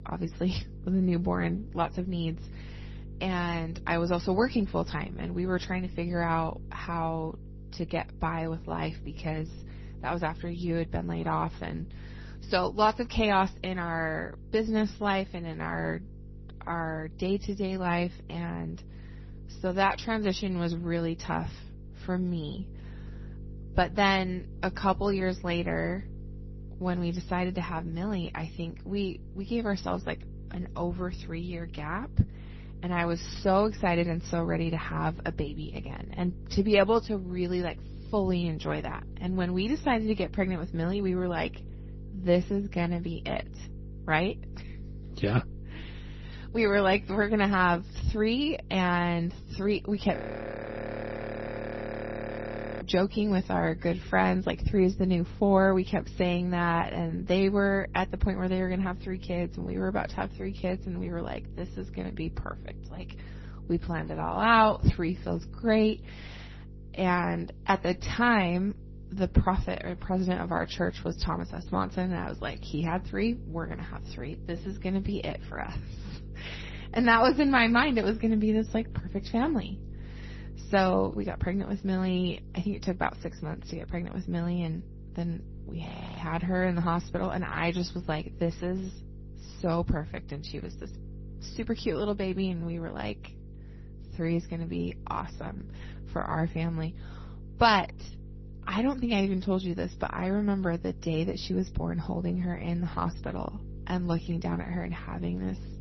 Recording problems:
garbled, watery; slightly; nothing above 6 kHz
electrical hum; faint; throughout; 50 Hz, 25 dB below the speech
audio freezing; at 50 s for 2.5 s and at 1:26

